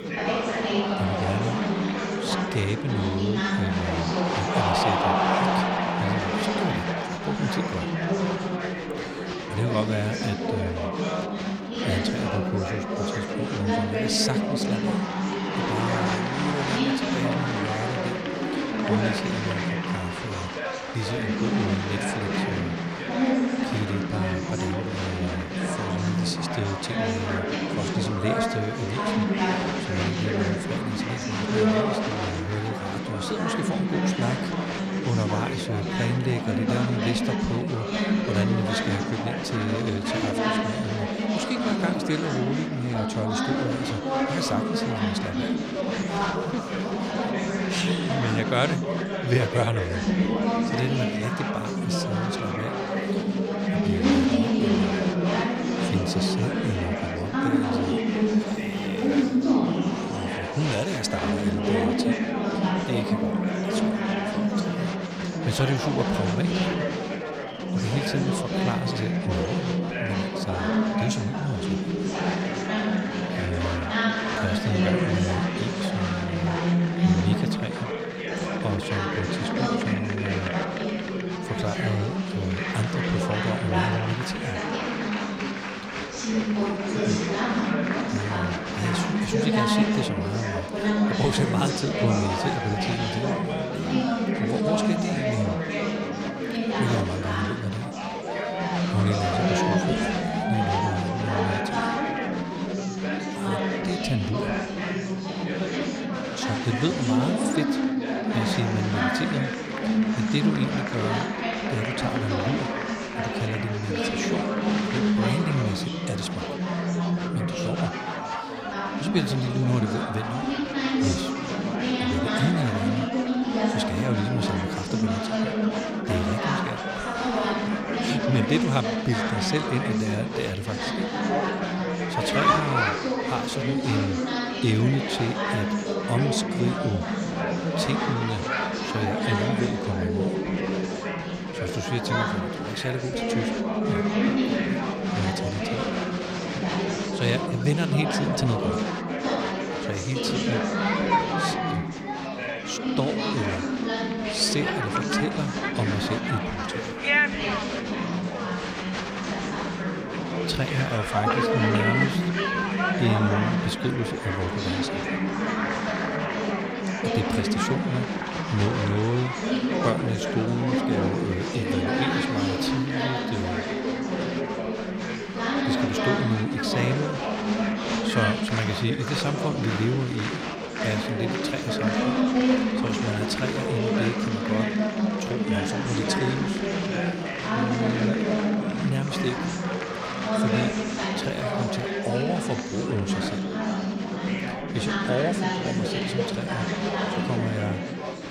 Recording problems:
chatter from many people; very loud; throughout; 4 dB above the speech

